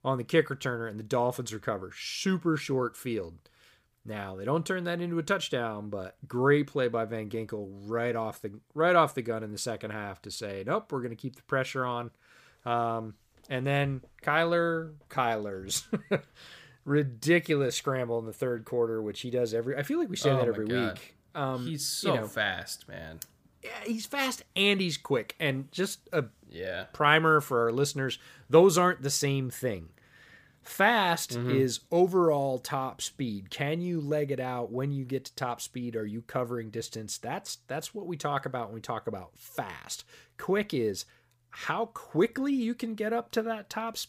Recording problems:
none

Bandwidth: 15 kHz